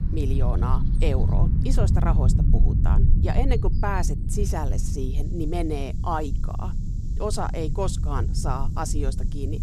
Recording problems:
low rumble; loud; throughout; 8 dB below the speech
animal sounds; faint; throughout; 25 dB below the speech

